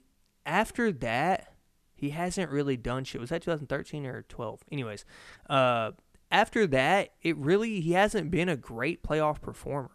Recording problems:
none

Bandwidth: 14 kHz